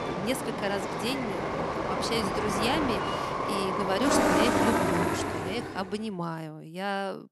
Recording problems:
train or aircraft noise; very loud; until 5.5 s; 4 dB above the speech

